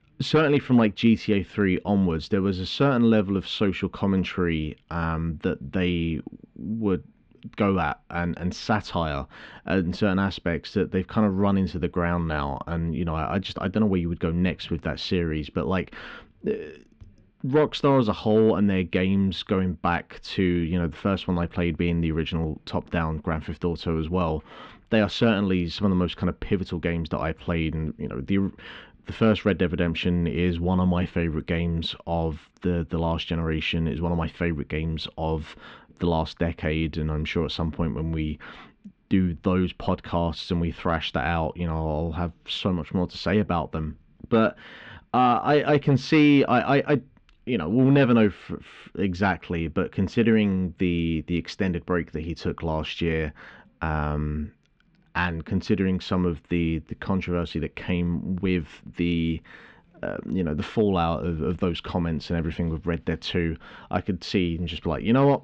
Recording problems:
muffled; slightly; fading above 4 kHz

